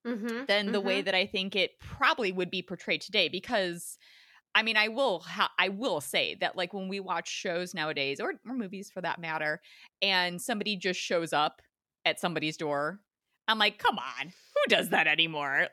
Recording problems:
none

